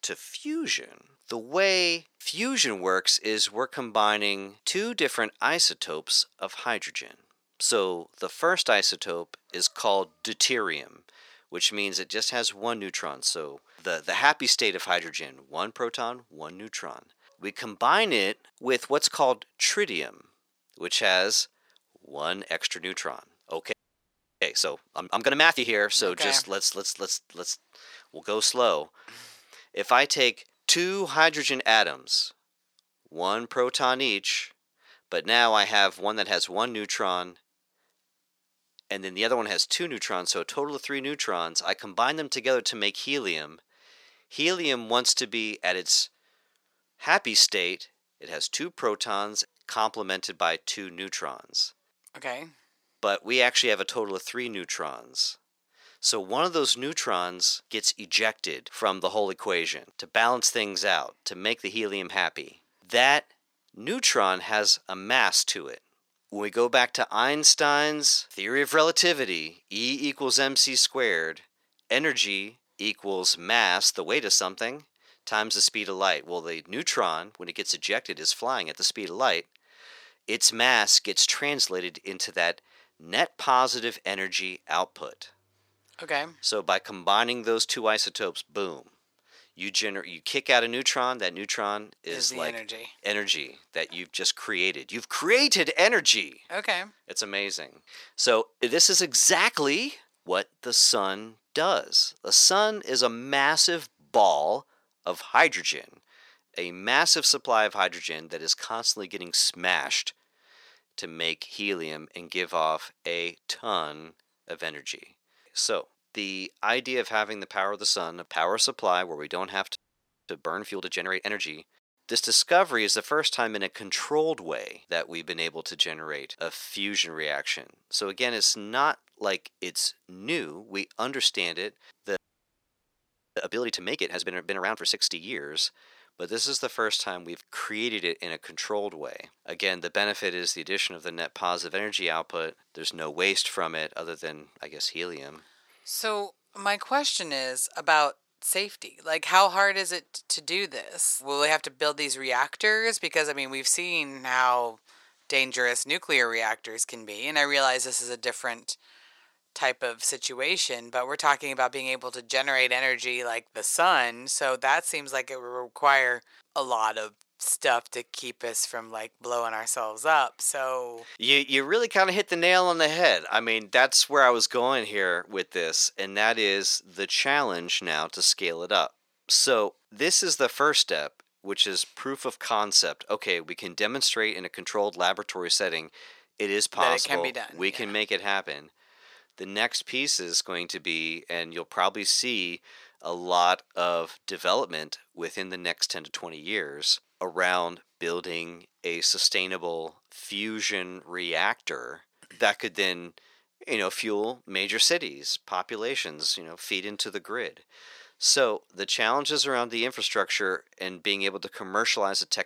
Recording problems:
thin; very; fading below 550 Hz
audio freezing; at 24 s for 0.5 s, at 2:00 for 0.5 s and at 2:12 for 1 s

